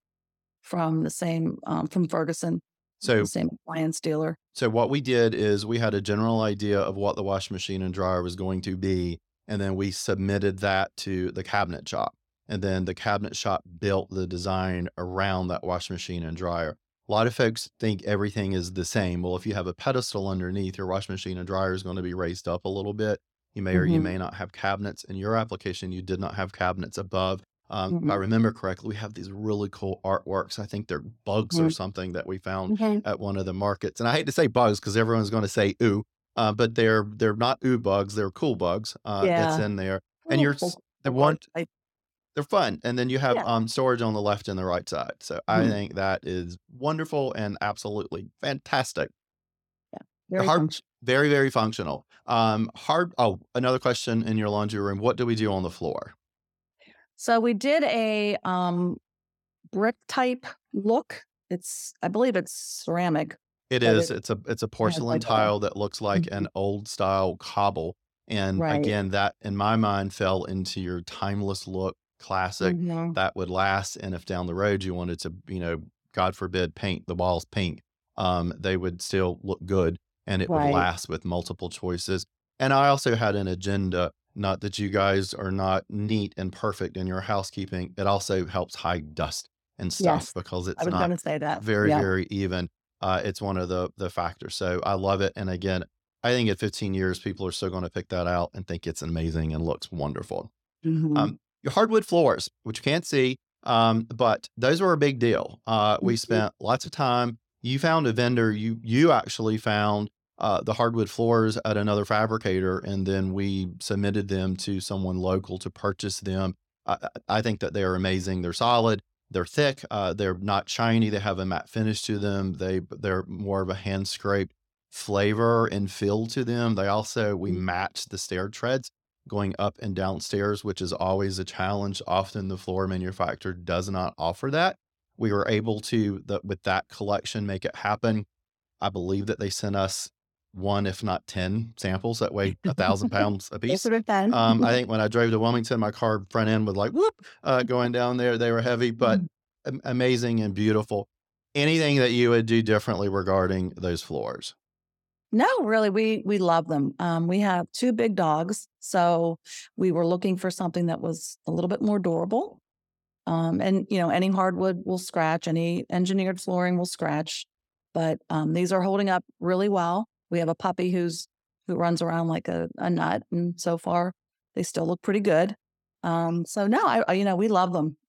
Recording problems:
none

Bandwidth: 17 kHz